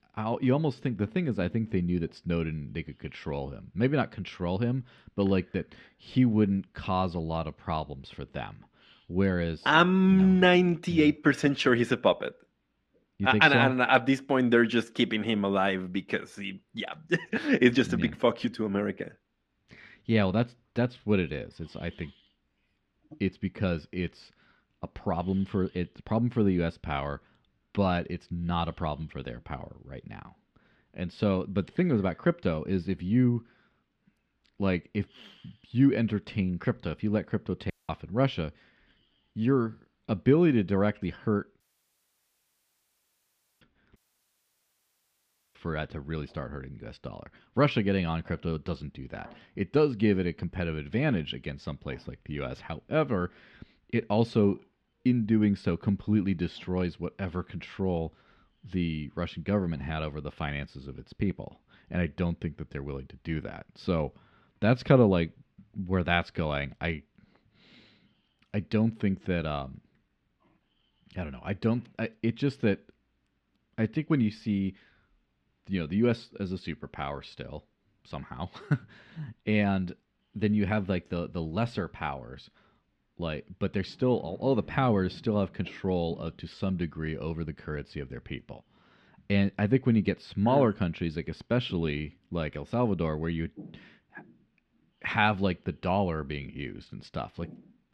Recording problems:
muffled; slightly; fading above 3 kHz
audio cutting out; at 38 s, at 42 s for 2 s and at 44 s for 1.5 s

